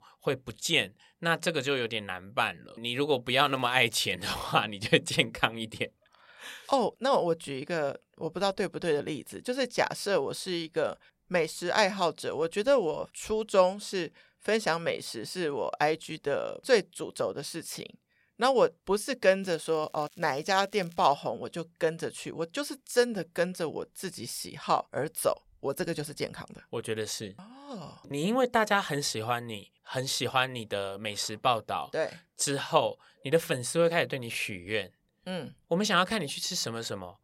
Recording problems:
crackling; faint; at 3.5 s and from 19 to 21 s; 30 dB below the speech

